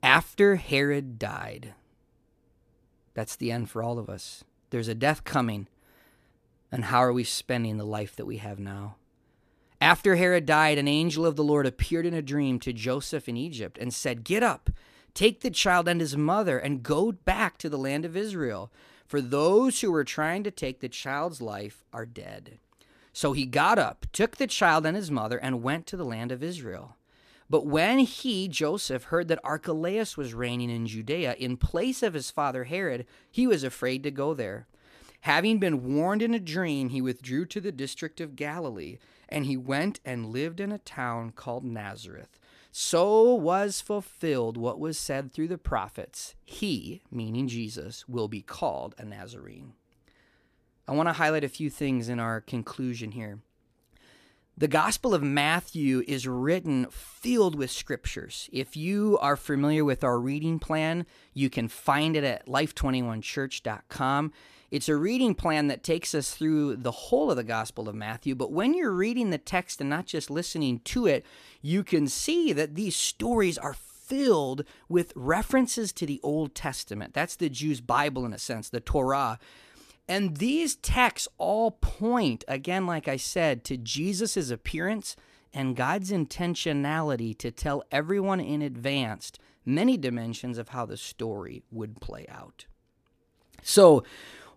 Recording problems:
none

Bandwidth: 14.5 kHz